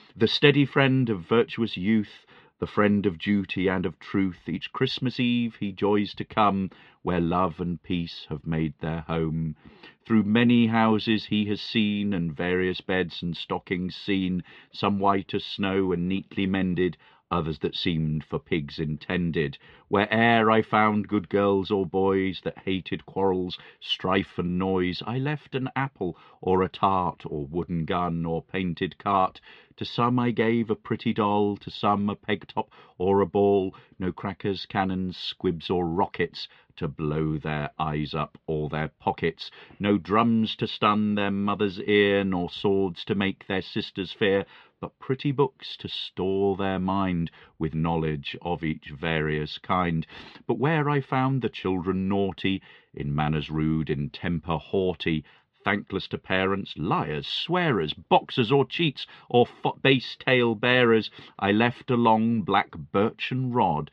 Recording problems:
muffled; slightly; fading above 3.5 kHz

